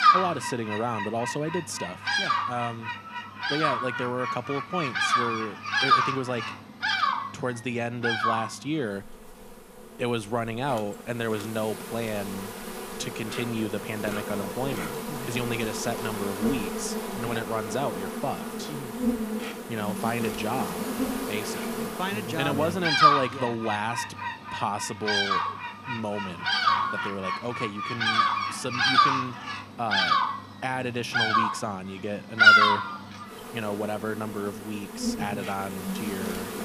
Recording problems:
animal sounds; very loud; throughout; 5 dB above the speech

